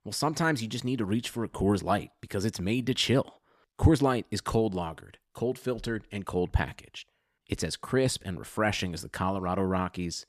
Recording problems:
none

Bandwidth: 14.5 kHz